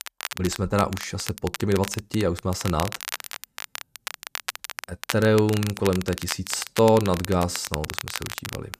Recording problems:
crackle, like an old record; loud; 9 dB below the speech

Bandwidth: 14.5 kHz